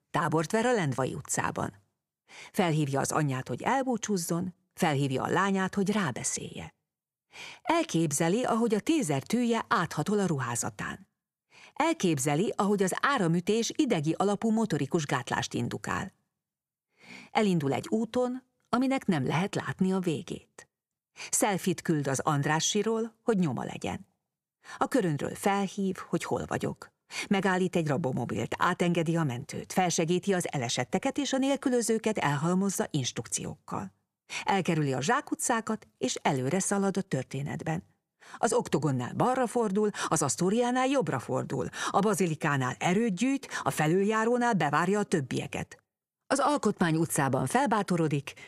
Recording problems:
none

